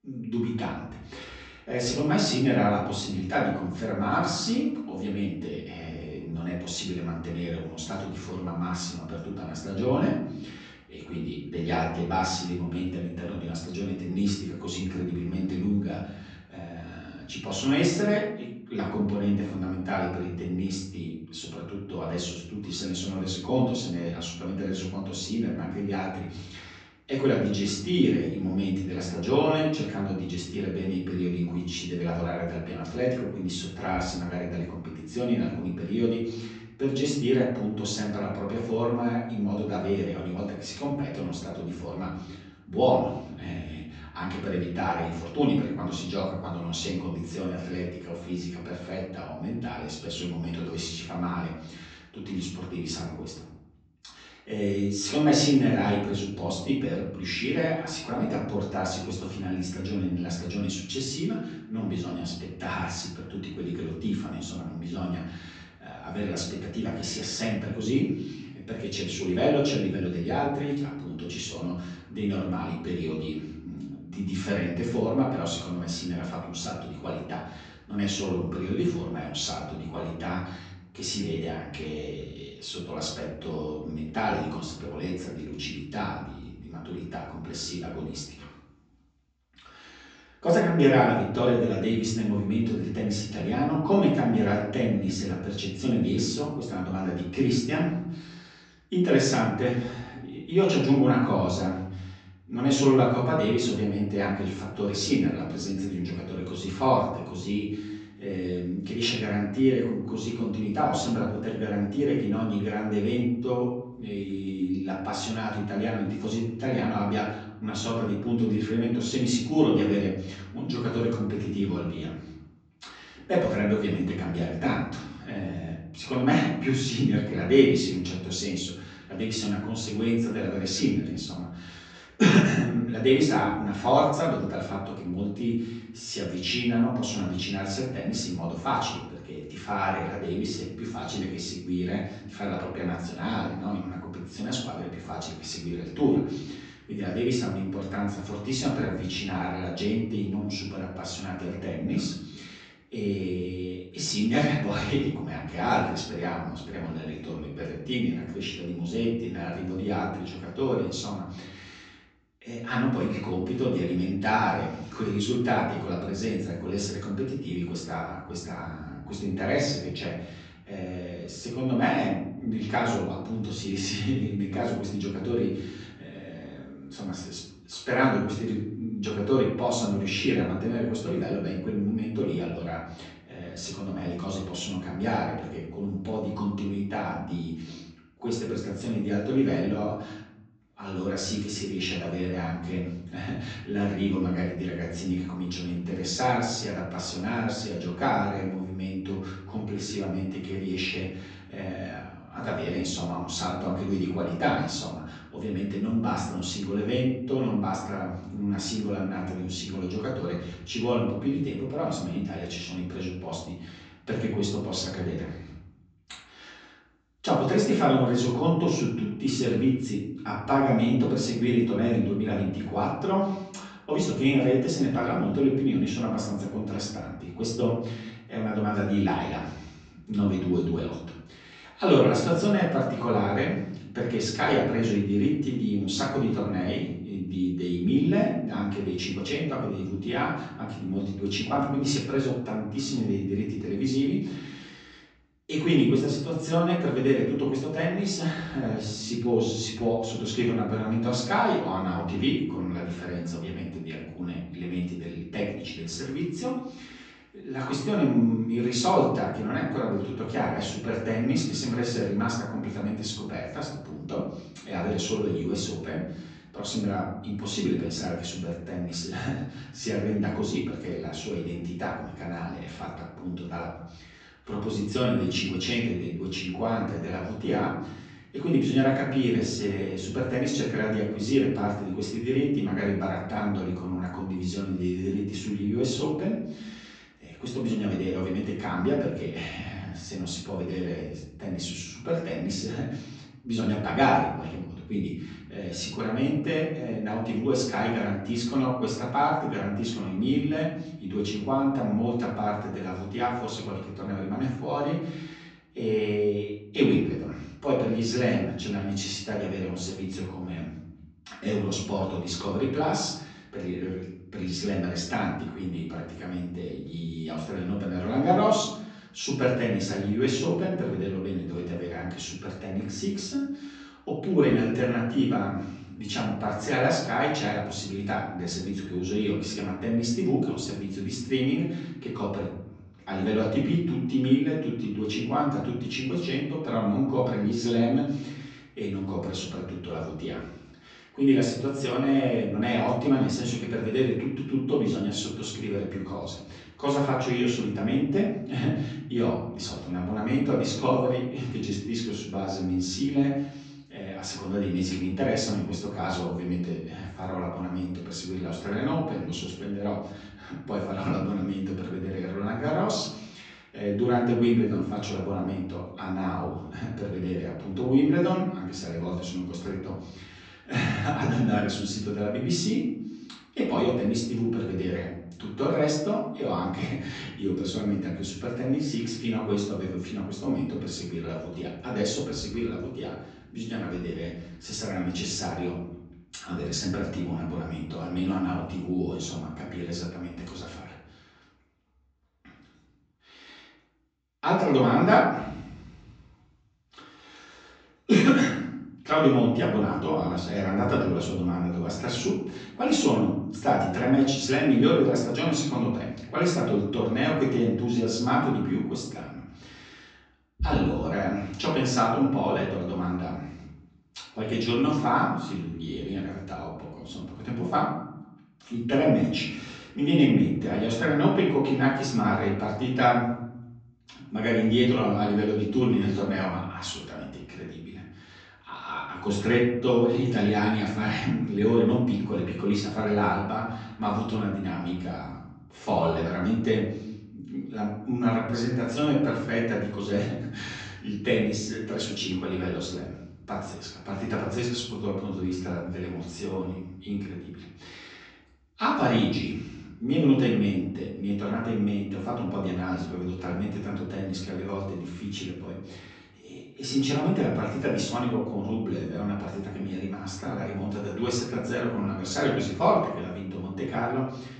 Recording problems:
off-mic speech; far
room echo; noticeable; dies away in 0.8 s
high frequencies cut off; noticeable; nothing above 8 kHz

